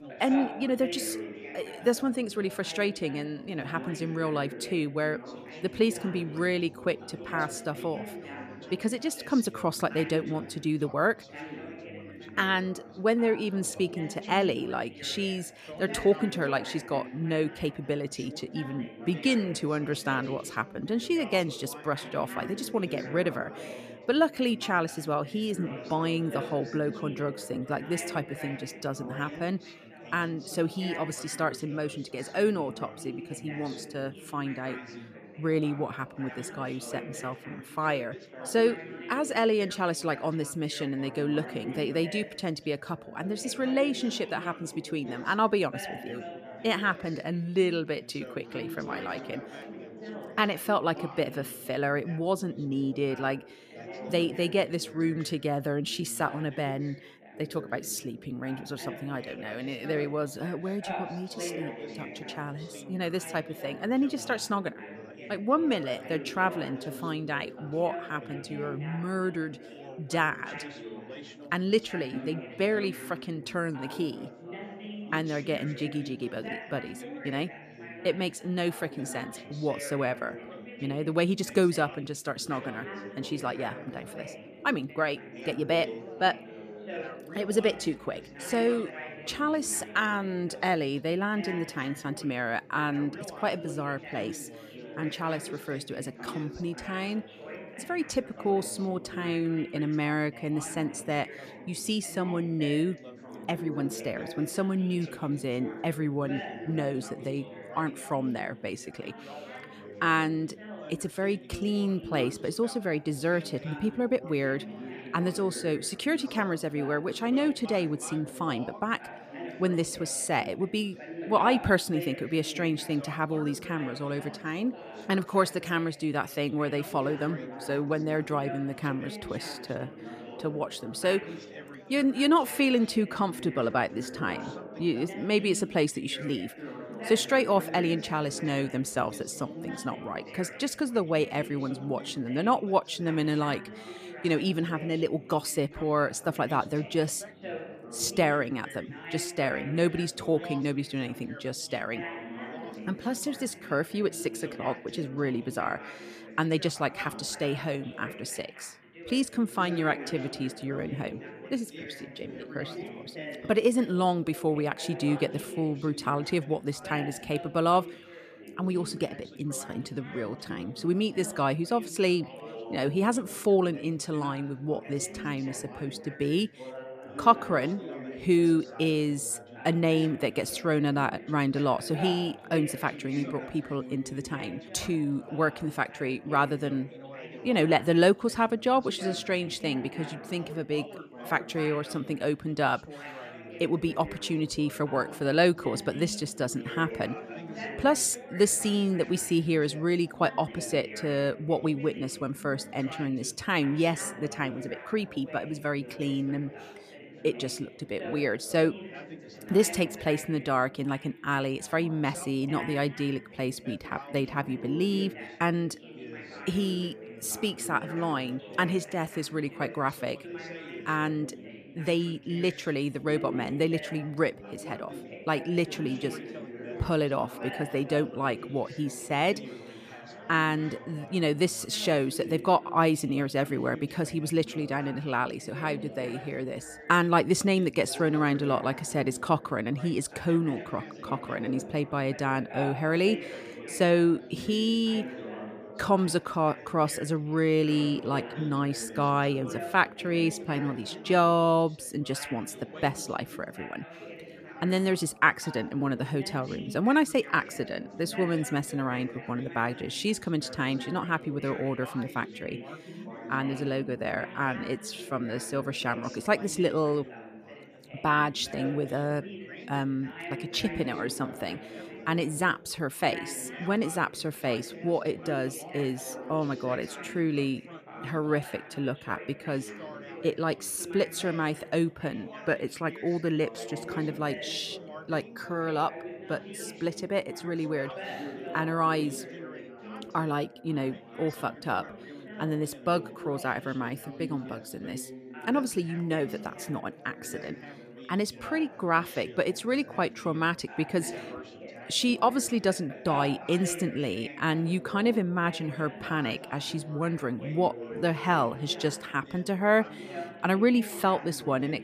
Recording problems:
background chatter; noticeable; throughout; 4 voices, 15 dB below the speech

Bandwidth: 14.5 kHz